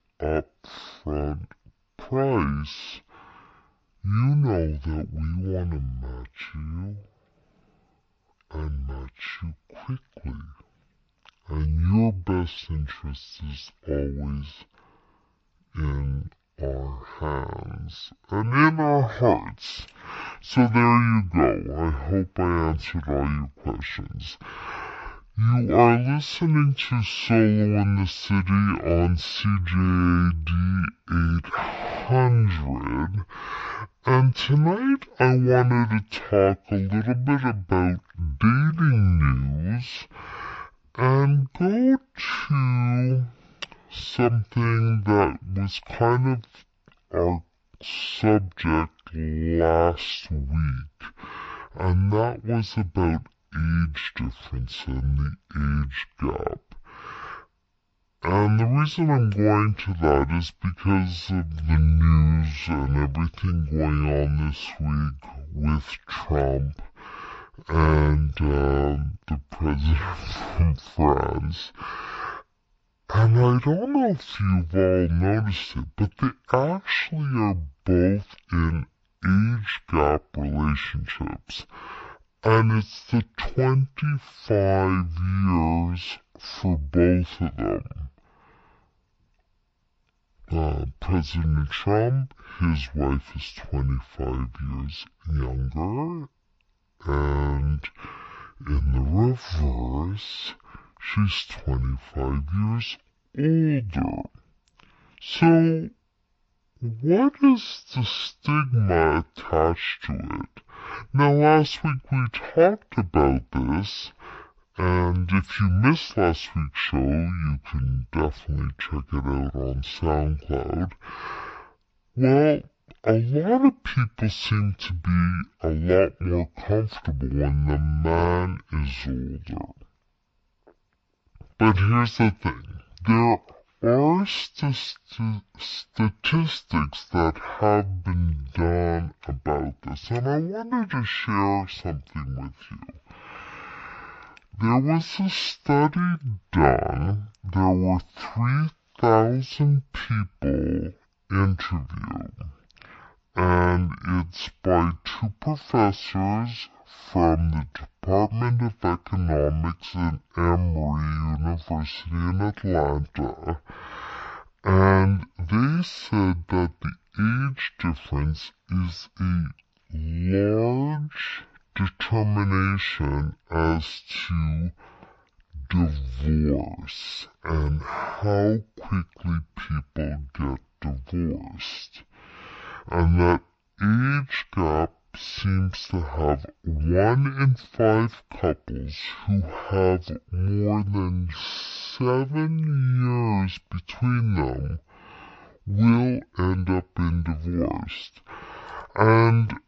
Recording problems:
wrong speed and pitch; too slow and too low; 0.5 times normal speed

